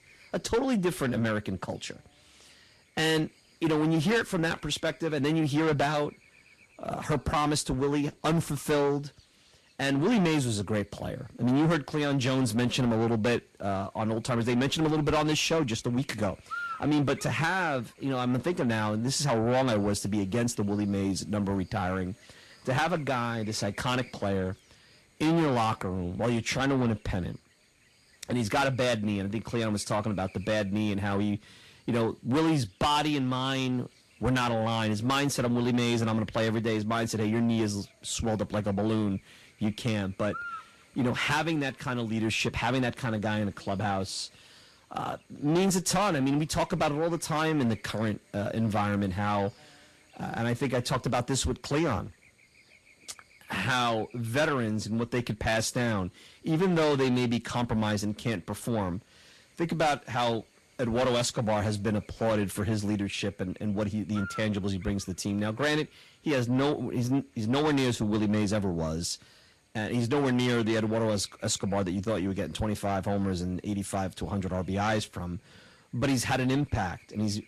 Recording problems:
distortion; heavy; 7 dB below the speech
garbled, watery; slightly; nothing above 12.5 kHz
electrical hum; noticeable; throughout; 60 Hz, 20 dB below the speech

